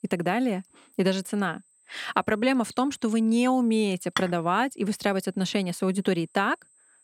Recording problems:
high-pitched whine; faint; throughout; 8.5 kHz, 35 dB below the speech
clattering dishes; noticeable; at 4 s; peak 6 dB below the speech

